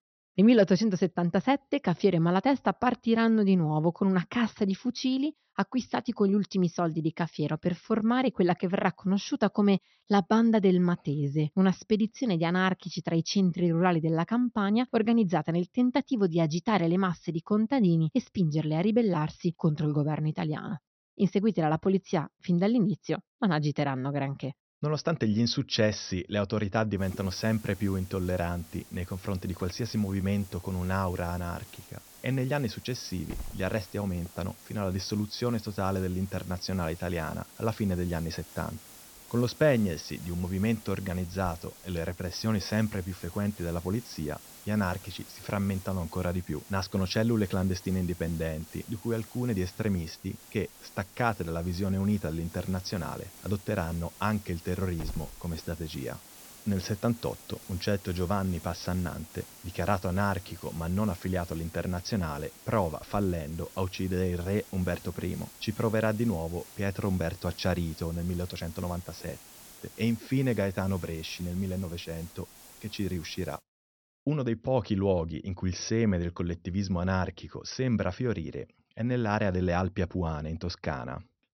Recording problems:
high frequencies cut off; noticeable; nothing above 6 kHz
hiss; noticeable; from 27 s to 1:14; 20 dB below the speech

